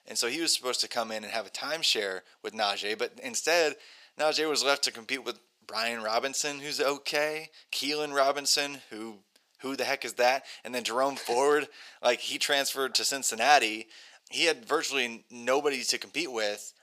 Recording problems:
thin; very; fading below 450 Hz

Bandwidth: 15 kHz